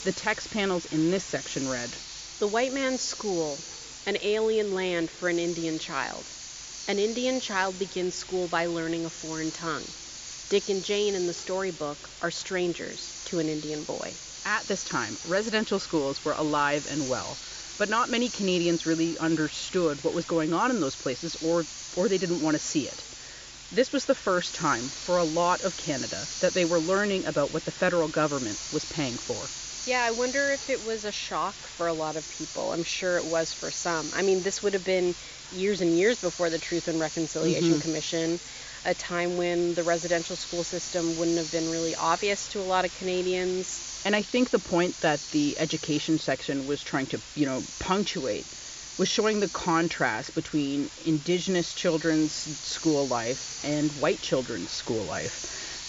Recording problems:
high frequencies cut off; noticeable; nothing above 7.5 kHz
hiss; loud; throughout; 9 dB below the speech

